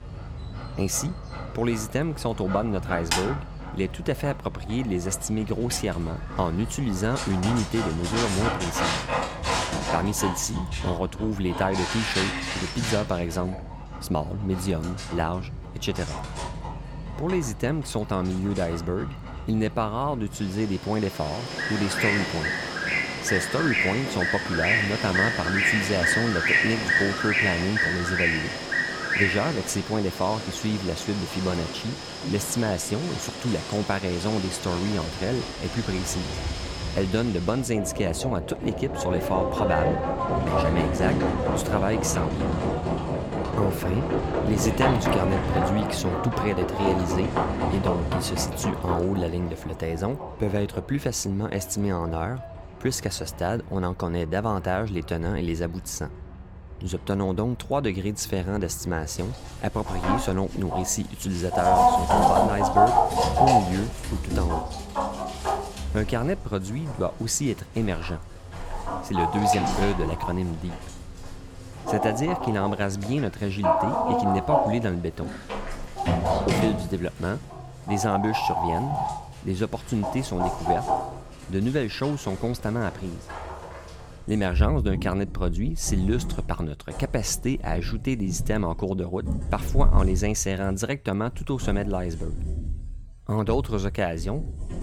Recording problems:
animal sounds; very loud; throughout; 1 dB above the speech

